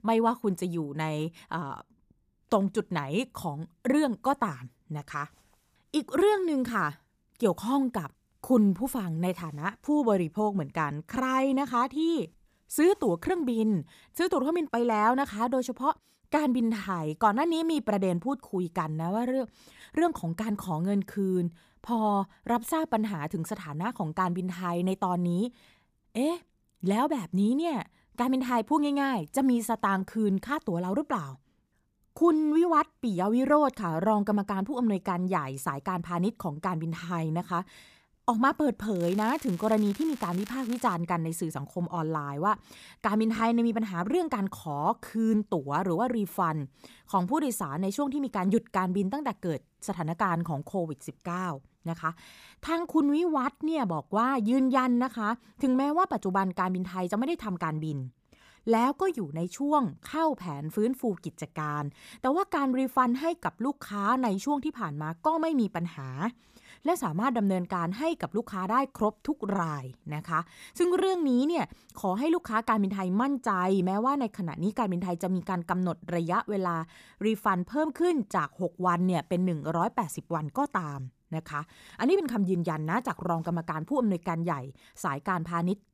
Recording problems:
crackling; noticeable; from 39 to 41 s; 20 dB below the speech

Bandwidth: 15 kHz